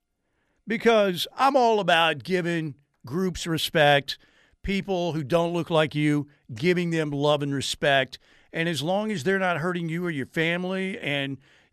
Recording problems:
none

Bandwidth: 13.5 kHz